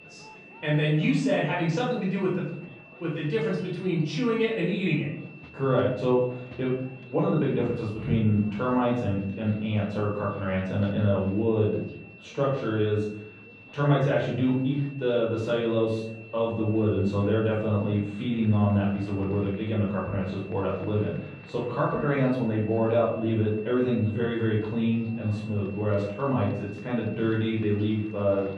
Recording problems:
off-mic speech; far
muffled; very; fading above 4 kHz
room echo; noticeable; dies away in 0.6 s
high-pitched whine; faint; throughout; 2.5 kHz, 20 dB below the speech
murmuring crowd; faint; throughout; 25 dB below the speech

